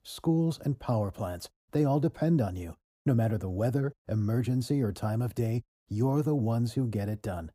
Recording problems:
muffled; slightly; fading above 1 kHz

